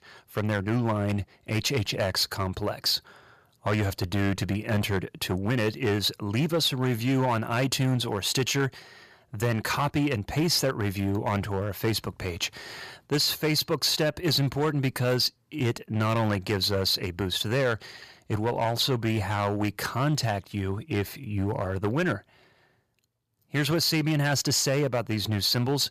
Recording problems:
distortion; slight; 7% of the sound clipped

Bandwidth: 14.5 kHz